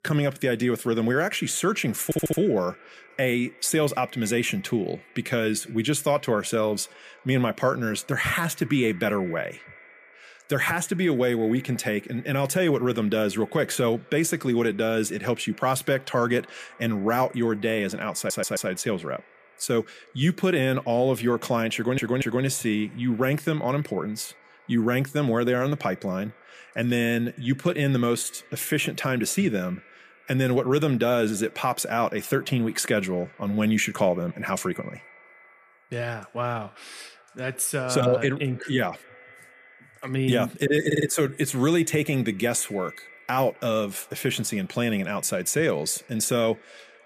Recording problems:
echo of what is said; faint; throughout; 250 ms later, 25 dB below the speech
audio stuttering; 4 times, first at 2 s

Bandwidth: 14.5 kHz